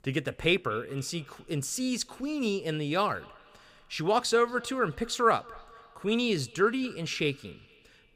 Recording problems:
echo of what is said; faint; throughout; 230 ms later, 25 dB below the speech

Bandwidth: 15.5 kHz